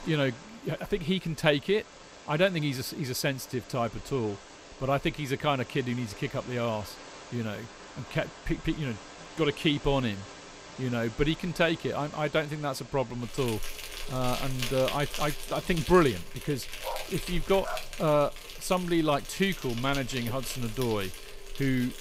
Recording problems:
animal sounds; noticeable; throughout; 10 dB below the speech
dog barking; noticeable; from 17 to 18 s; peak 9 dB below the speech

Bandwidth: 15.5 kHz